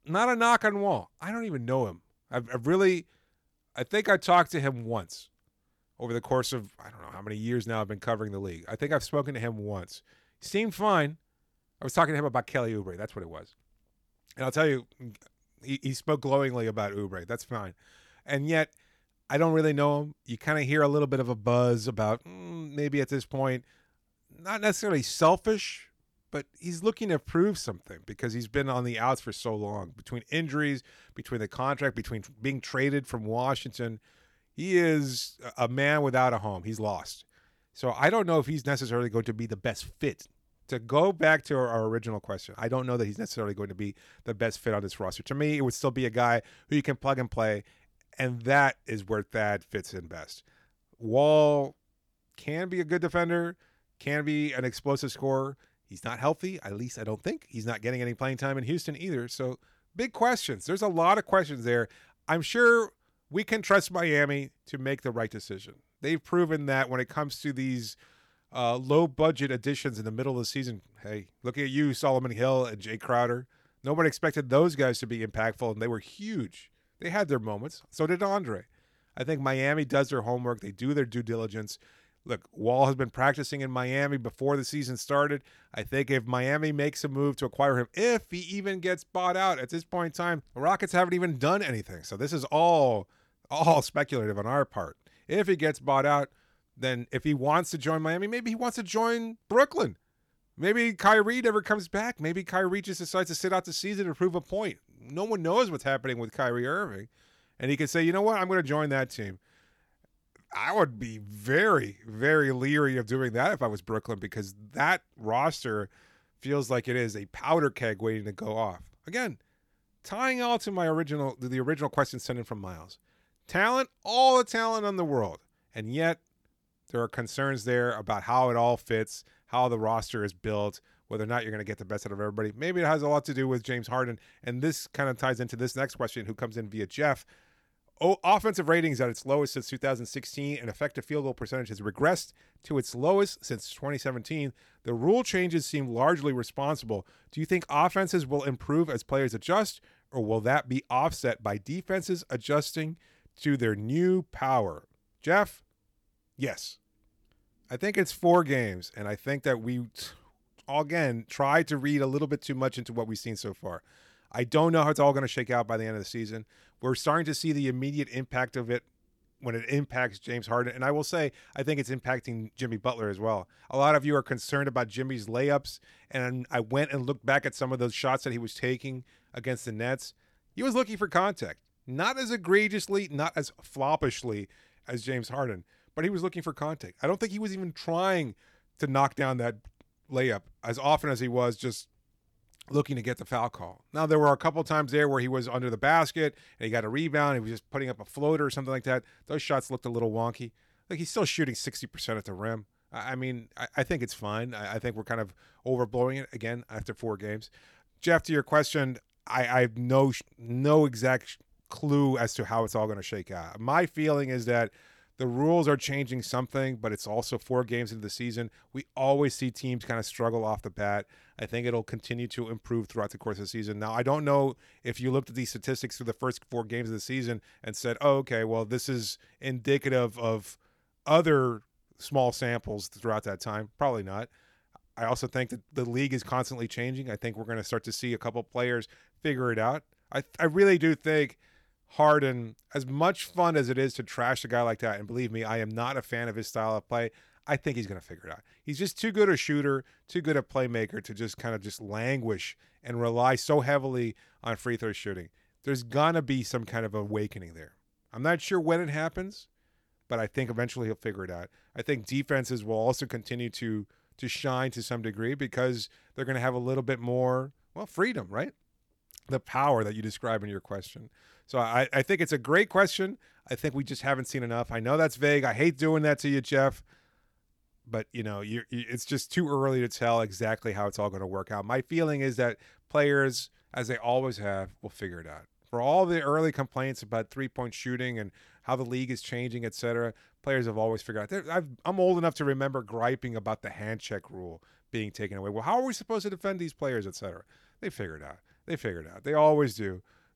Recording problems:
none

